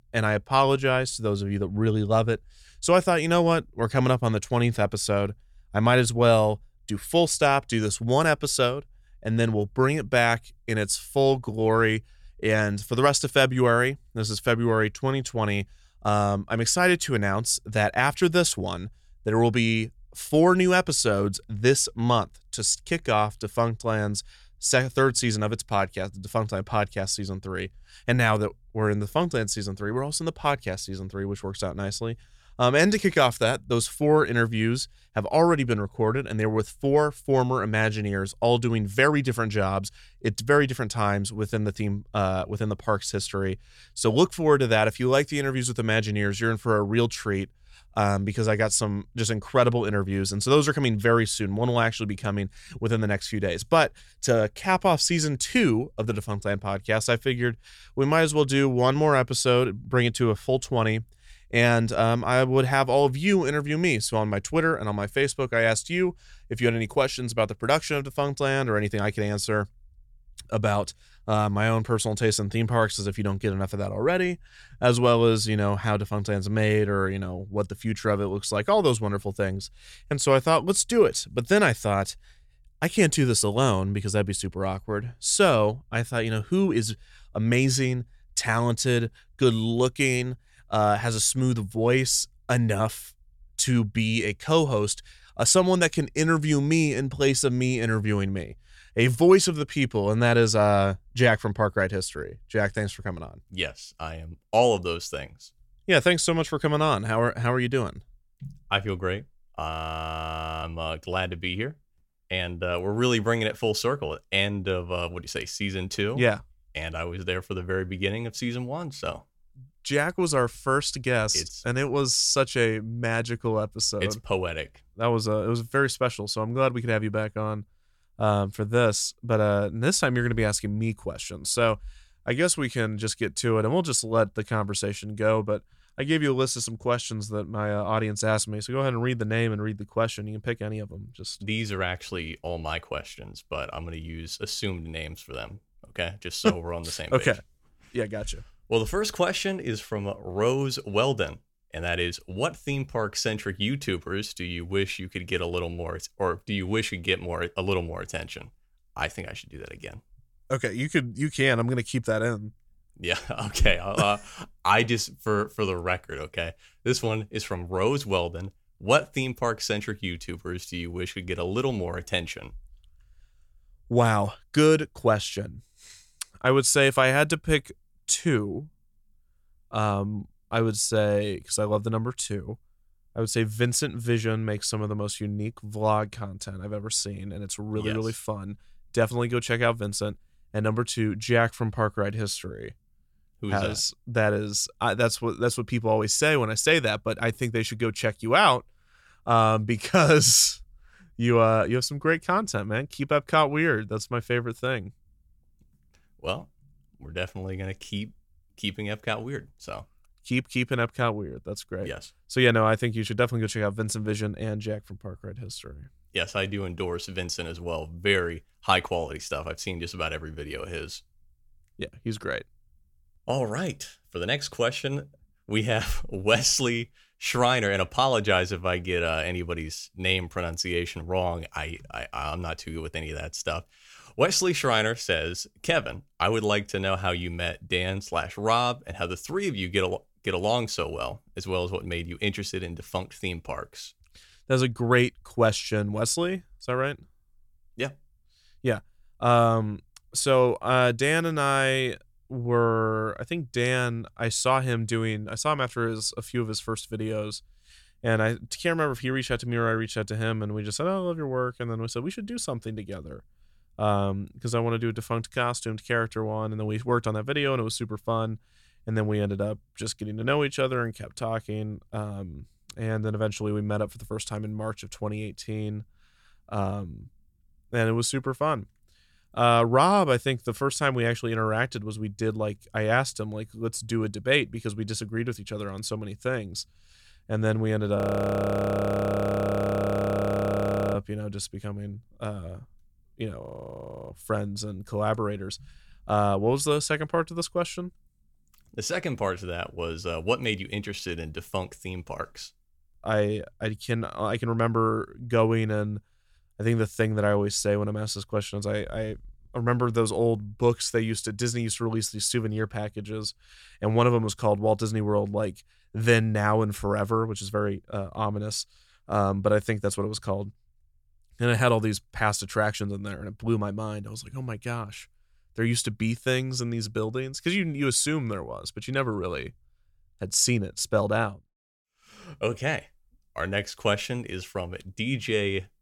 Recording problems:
audio freezing; at 1:50 for 1 s, at 4:48 for 3 s and at 4:53 for 0.5 s

